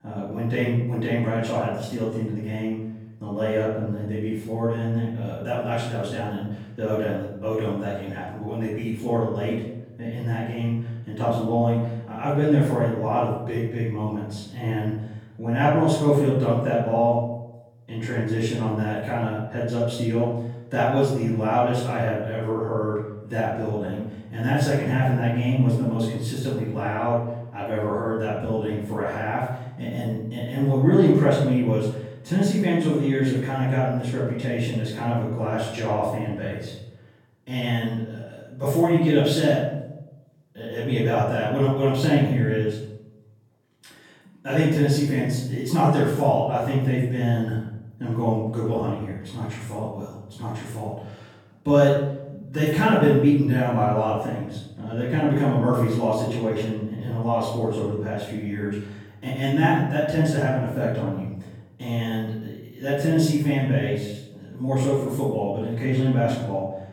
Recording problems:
off-mic speech; far
room echo; noticeable; dies away in 0.8 s

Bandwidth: 17.5 kHz